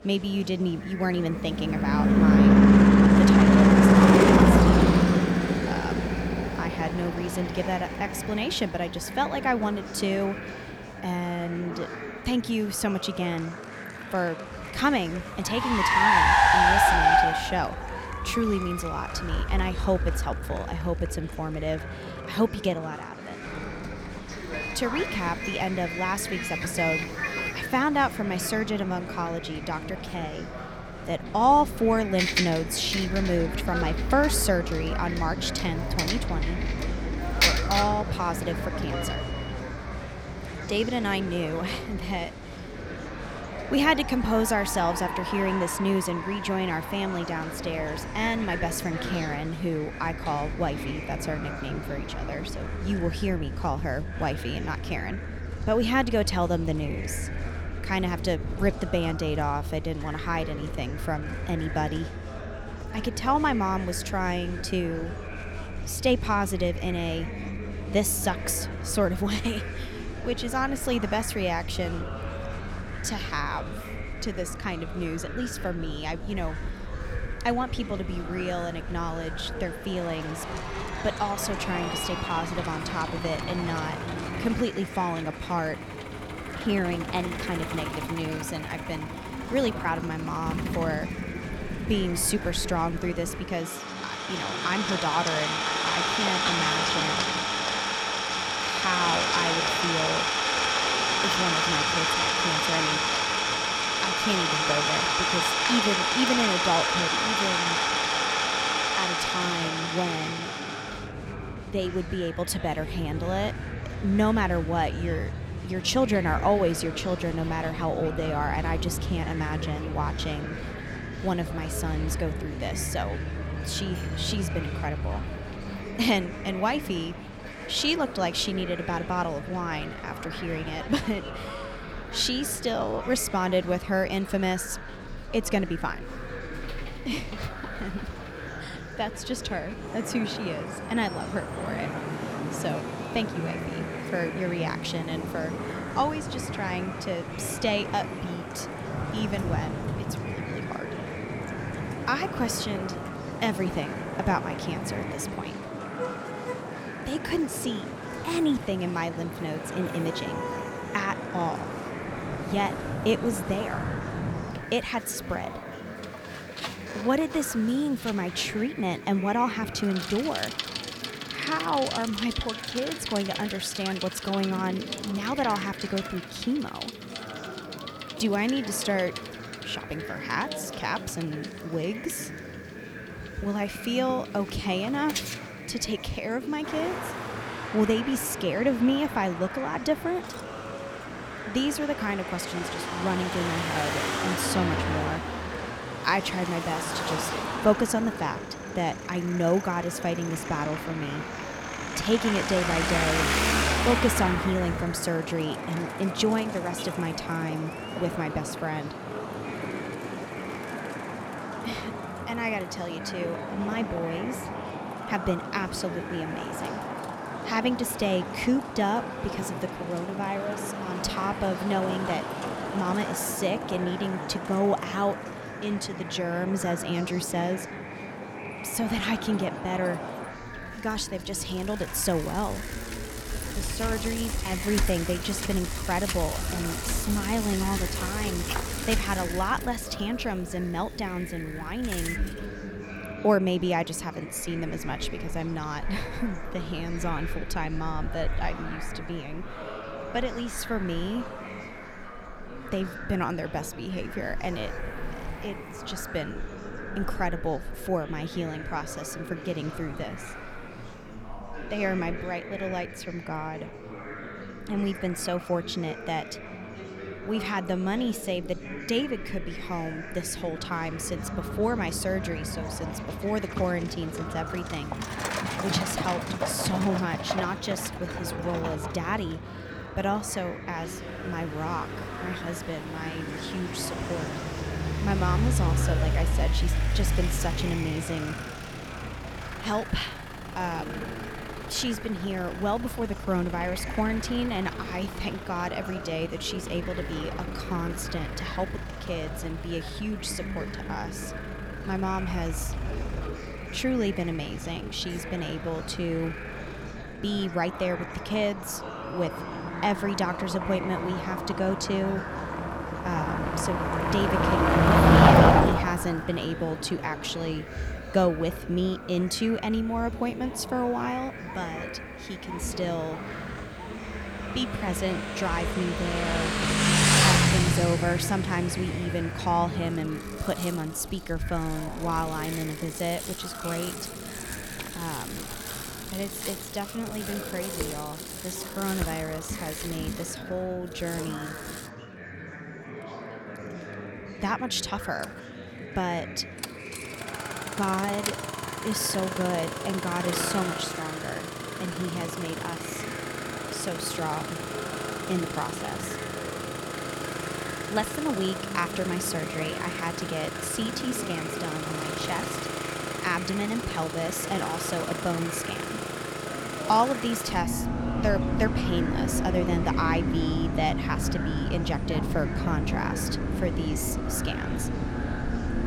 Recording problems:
traffic noise; very loud; throughout; as loud as the speech
murmuring crowd; loud; throughout; 9 dB below the speech

